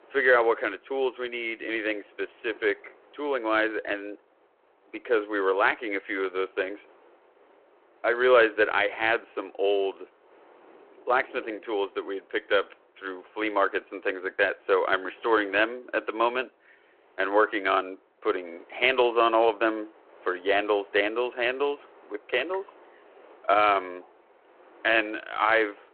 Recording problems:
phone-call audio
wind in the background; faint; throughout; 30 dB below the speech

